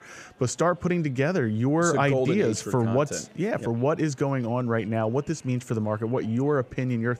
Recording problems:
murmuring crowd; faint; throughout; 30 dB below the speech

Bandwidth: 15 kHz